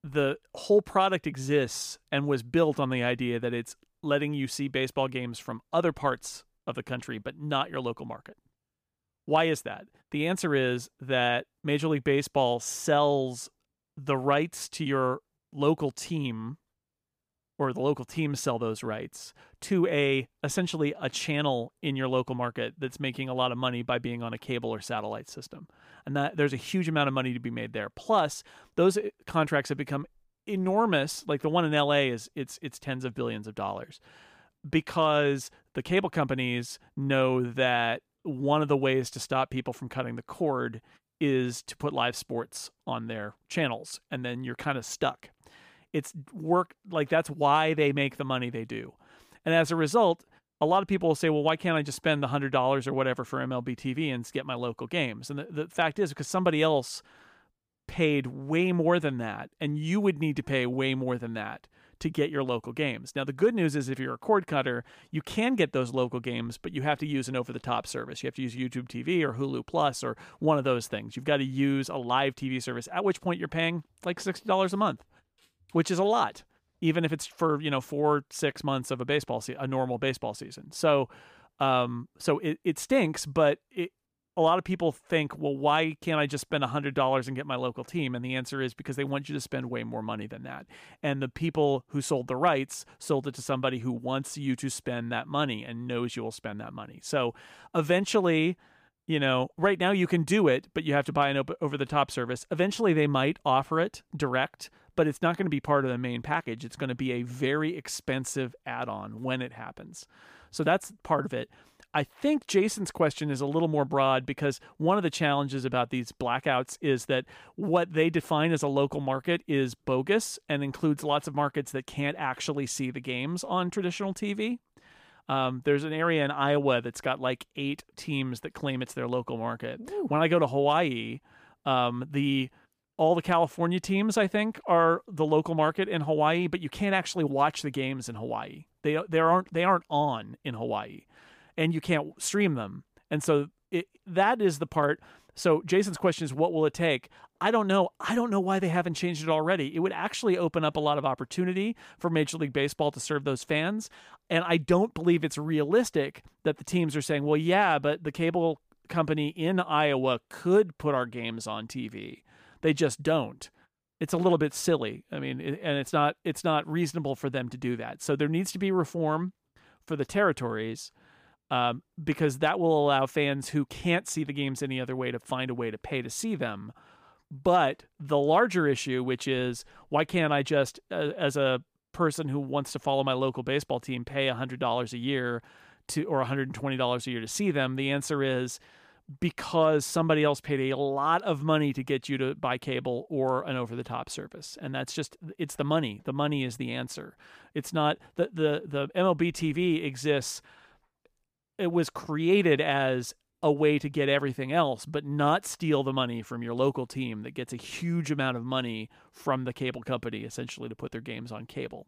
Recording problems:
none

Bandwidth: 15 kHz